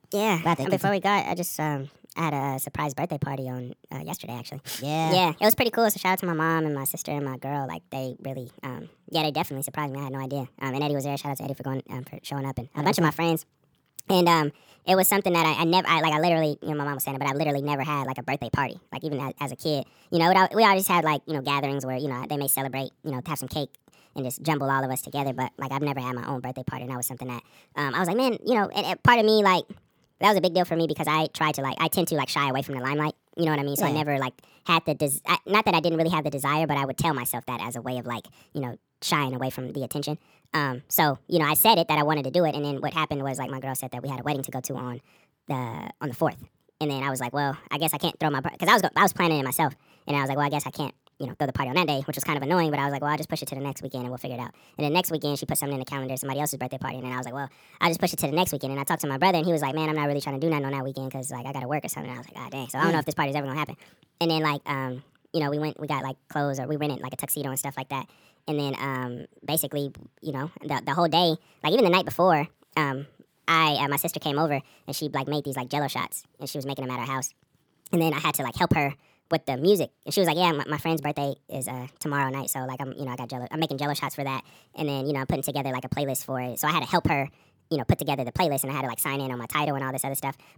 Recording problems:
wrong speed and pitch; too fast and too high; 1.5 times normal speed

